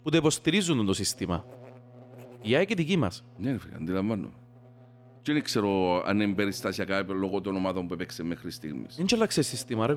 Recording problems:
electrical hum; faint; throughout; 60 Hz, 25 dB below the speech
abrupt cut into speech; at the end

